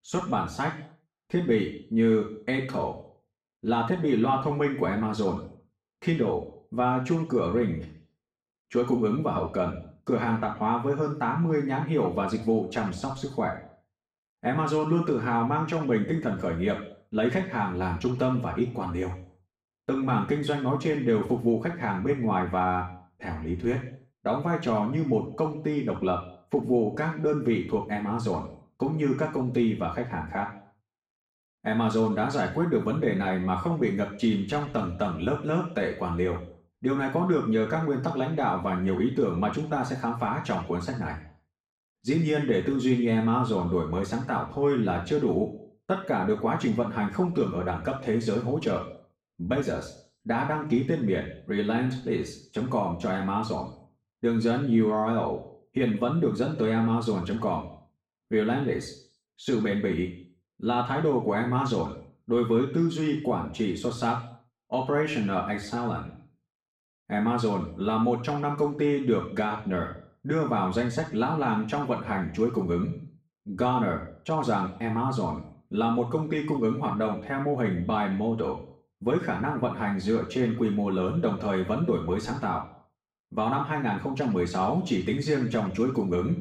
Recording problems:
off-mic speech; far
room echo; noticeable; dies away in 0.5 s

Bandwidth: 15 kHz